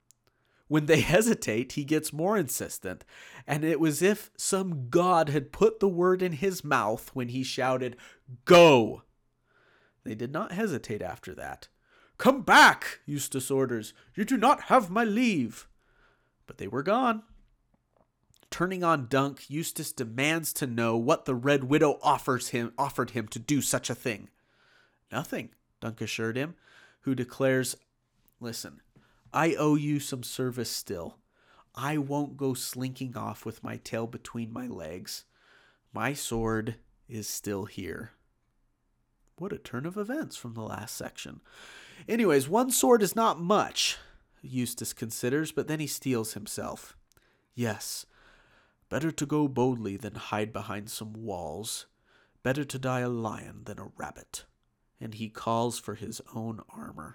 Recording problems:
none

